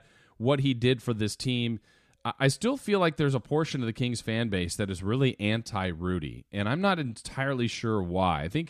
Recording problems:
none

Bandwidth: 15 kHz